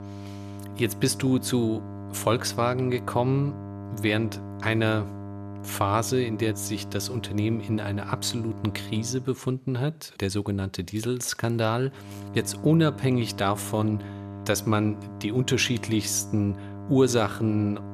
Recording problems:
electrical hum; noticeable; until 9 s and from 12 s on; 50 Hz, 15 dB below the speech

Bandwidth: 13.5 kHz